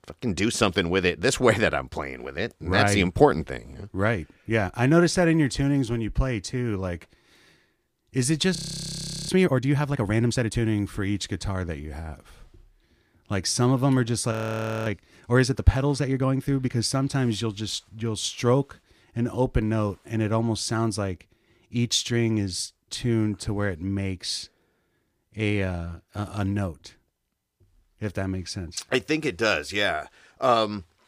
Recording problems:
audio freezing; at 8.5 s for 0.5 s and at 14 s for 0.5 s

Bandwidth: 15 kHz